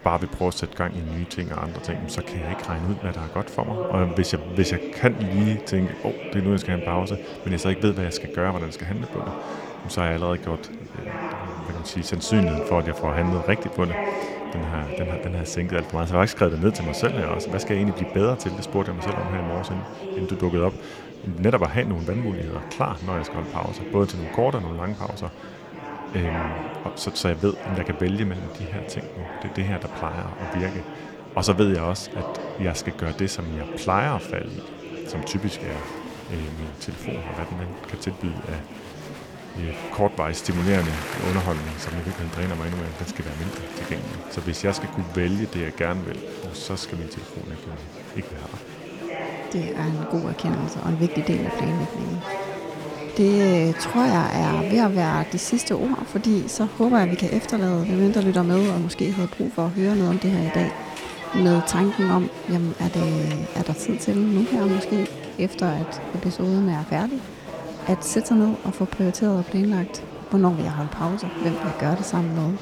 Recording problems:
murmuring crowd; loud; throughout; 9 dB below the speech

